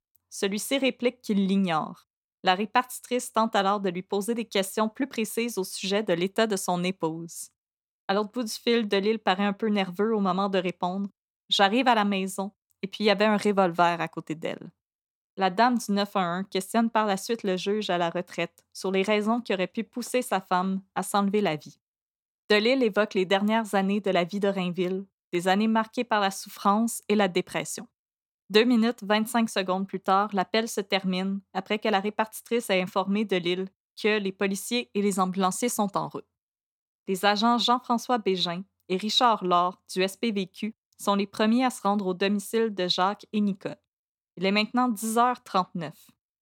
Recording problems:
none

